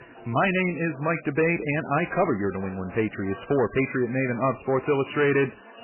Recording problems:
garbled, watery; badly; nothing above 2.5 kHz
distortion; slight; 10 dB below the speech
background chatter; faint; throughout; 4 voices, 20 dB below the speech

